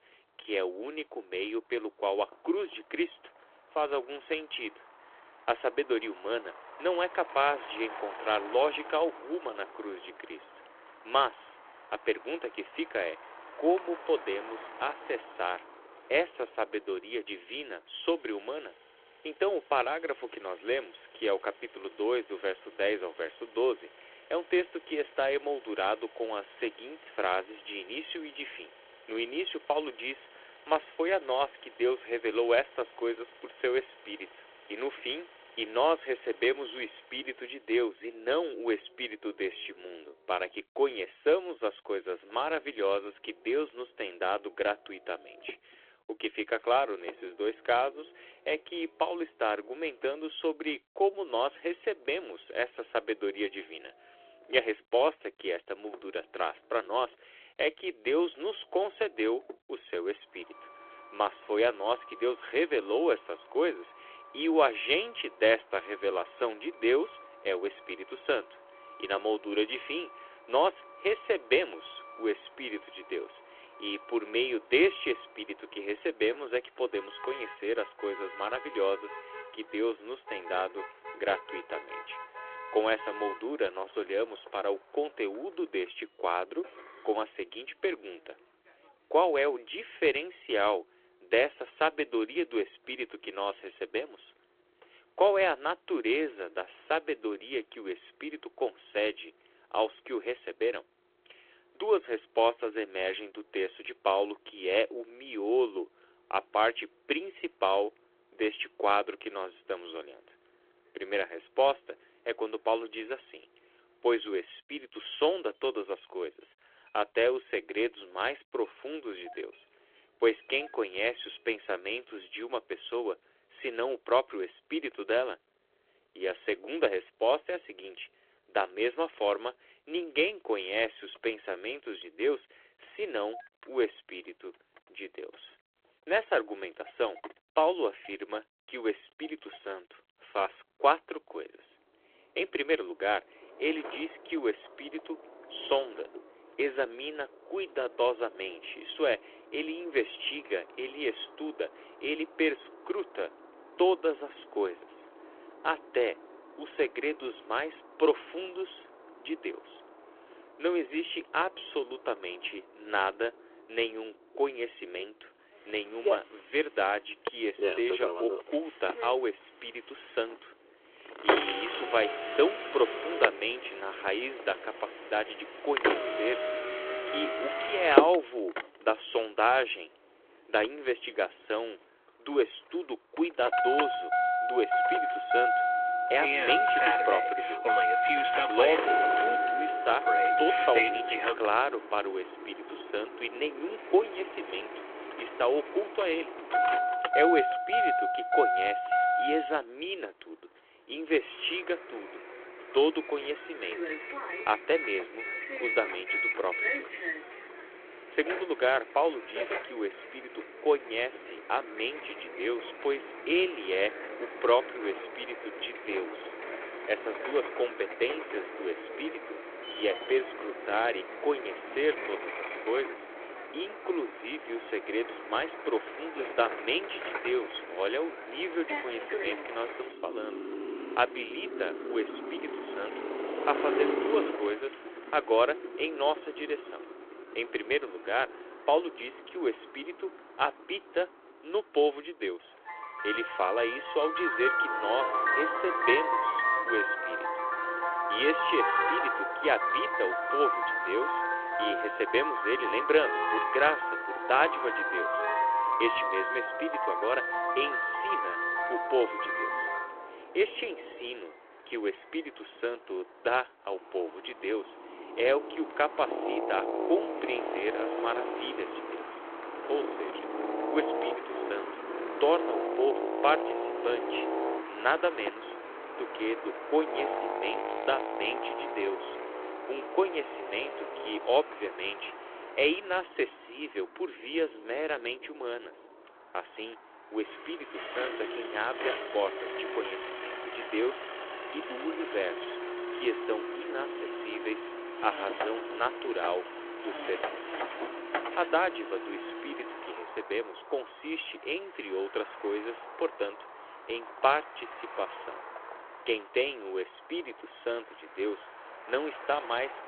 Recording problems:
phone-call audio
traffic noise; loud; throughout; 1 dB below the speech

